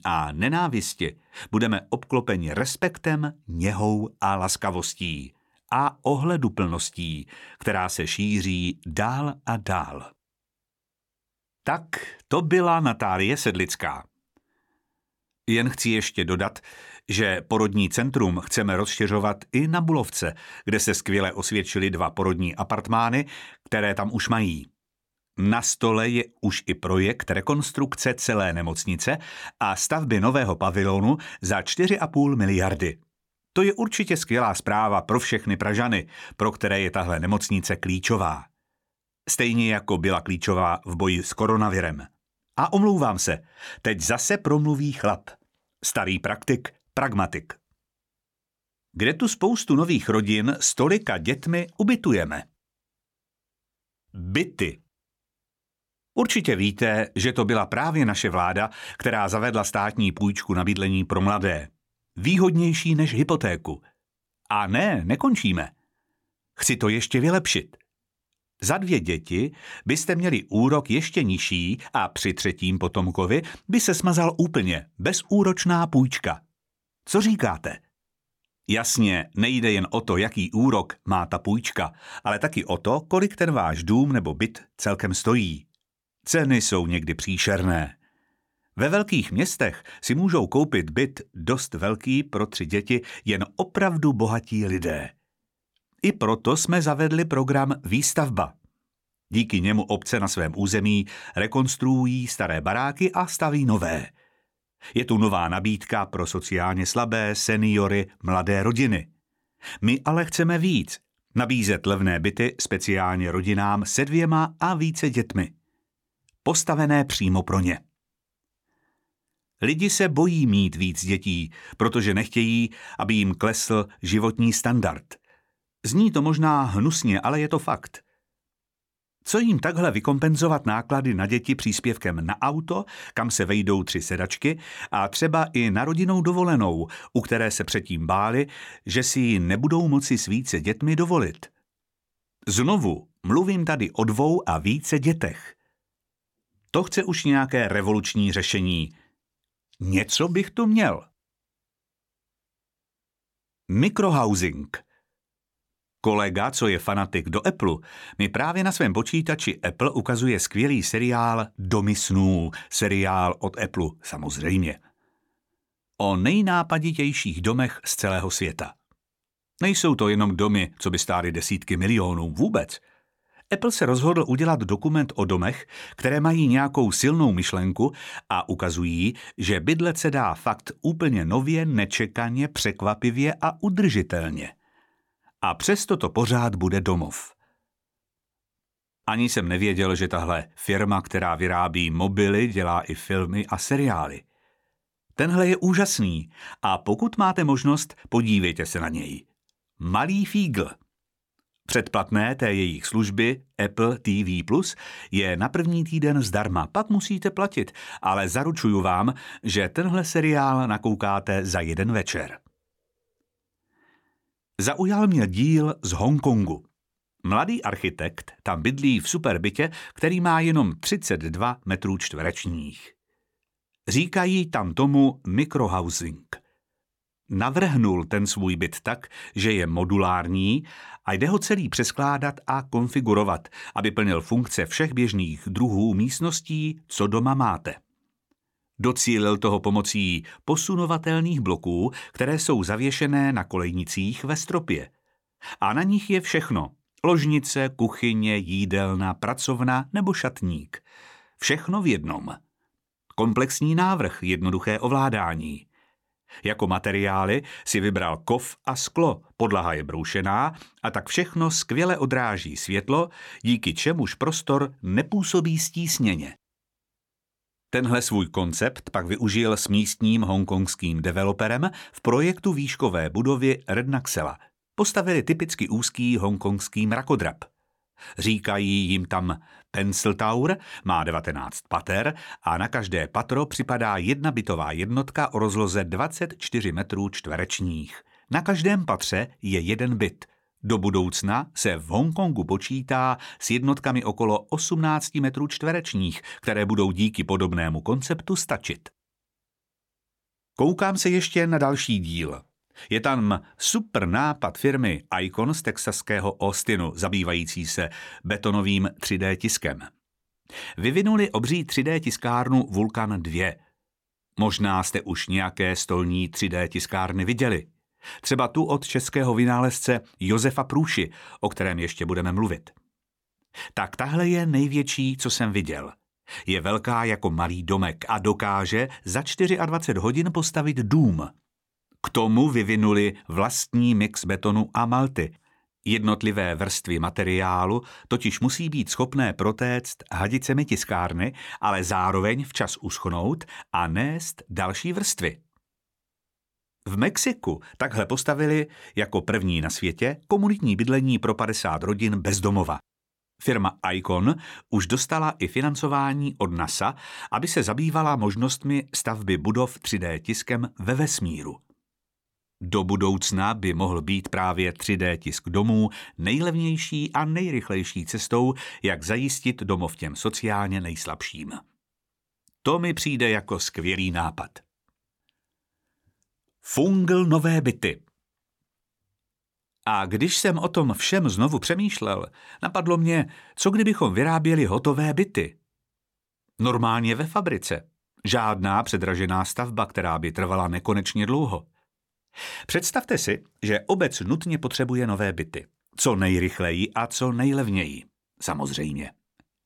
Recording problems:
none

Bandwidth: 17 kHz